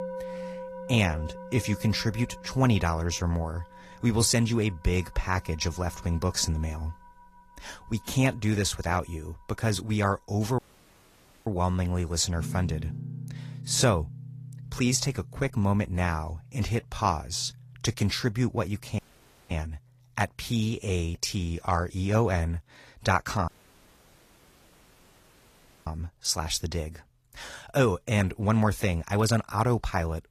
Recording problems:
garbled, watery; slightly; nothing above 14.5 kHz
background music; noticeable; throughout; 15 dB below the speech
audio cutting out; at 11 s for 1 s, at 19 s for 0.5 s and at 23 s for 2.5 s

